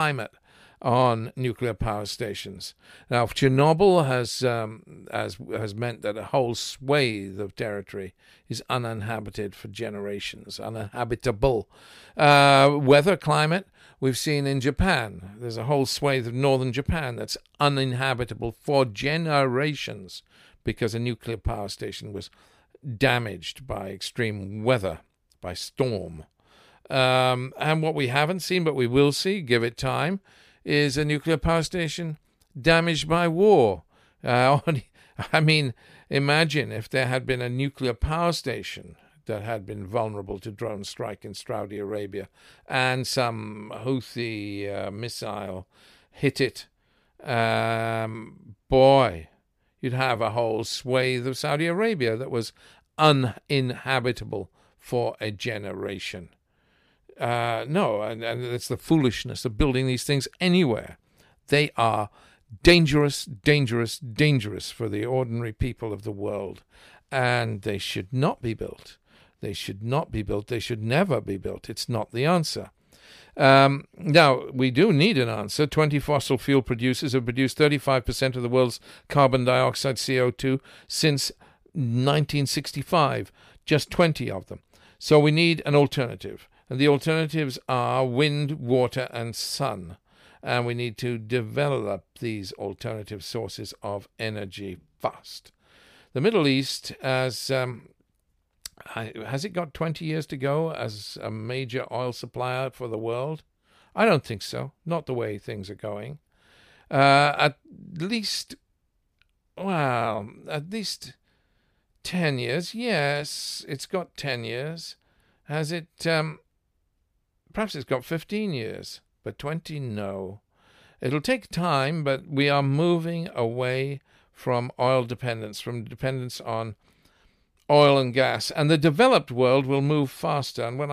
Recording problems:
abrupt cut into speech; at the start and the end

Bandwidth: 15 kHz